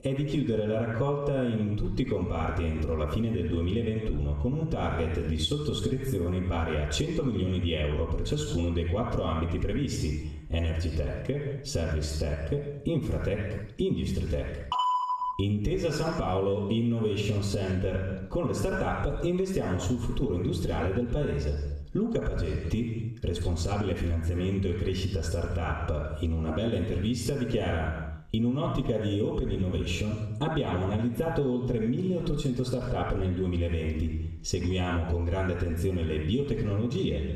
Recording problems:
off-mic speech; far
room echo; noticeable; dies away in 0.7 s
squashed, flat; somewhat

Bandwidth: 14 kHz